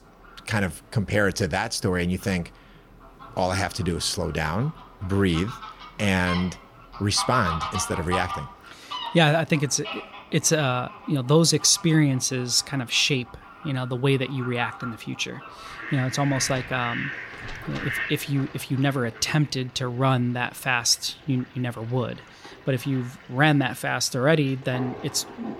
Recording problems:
animal sounds; noticeable; throughout; 10 dB below the speech

